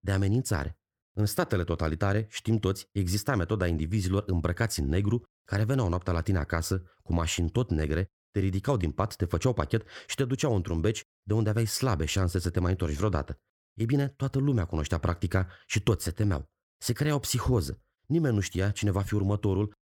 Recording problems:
none

